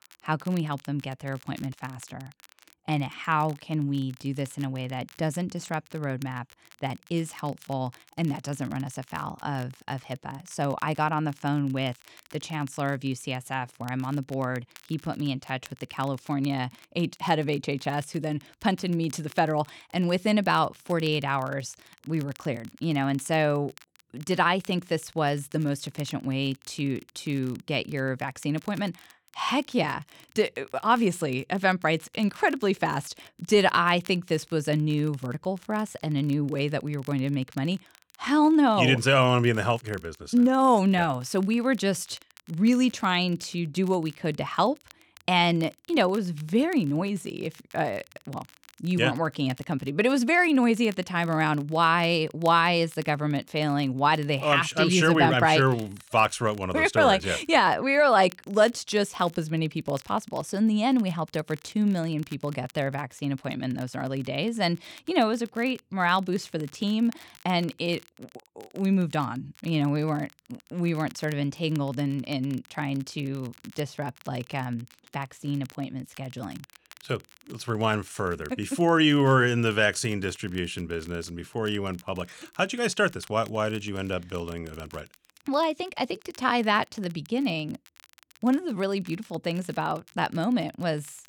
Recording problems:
crackle, like an old record; faint; 25 dB below the speech

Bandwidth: 18.5 kHz